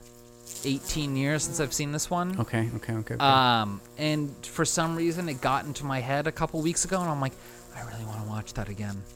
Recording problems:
electrical hum; noticeable; throughout; 60 Hz, 20 dB below the speech

